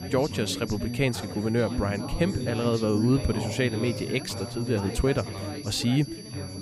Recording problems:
background chatter; loud; throughout; 4 voices, 7 dB below the speech
high-pitched whine; noticeable; throughout; 4.5 kHz, 15 dB below the speech

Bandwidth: 14.5 kHz